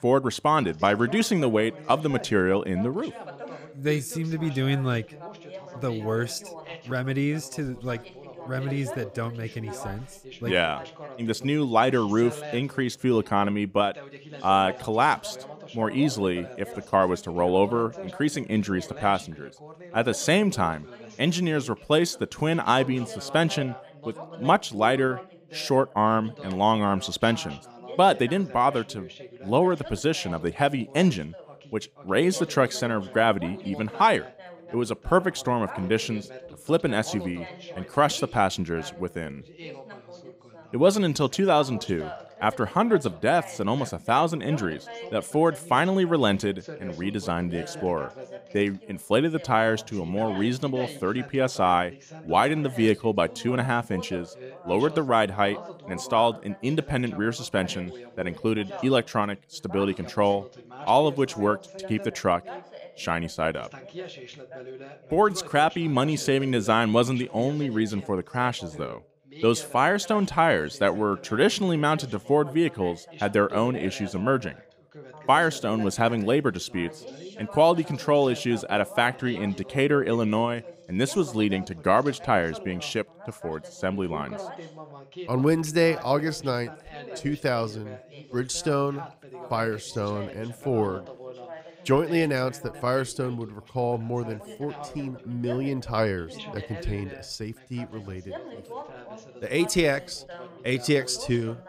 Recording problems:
background chatter; noticeable; throughout; 2 voices, 15 dB below the speech

